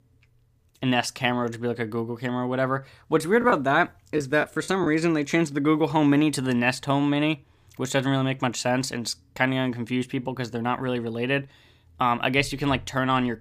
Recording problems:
choppy; very; from 3.5 to 5 s; 10% of the speech affected

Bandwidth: 15 kHz